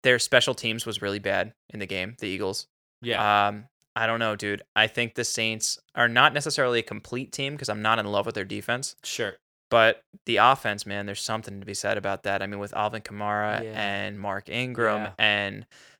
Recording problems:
none

